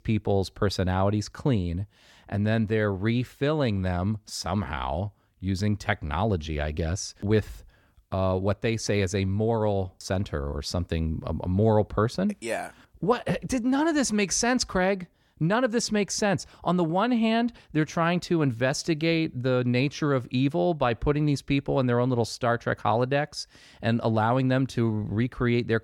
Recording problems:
none

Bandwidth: 17.5 kHz